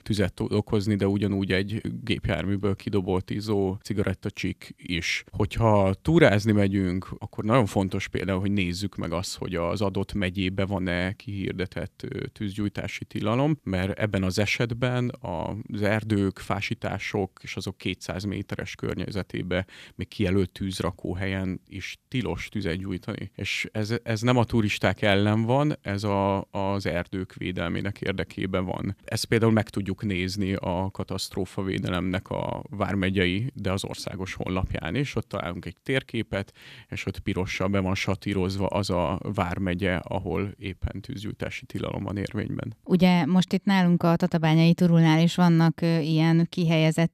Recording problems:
none

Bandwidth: 14.5 kHz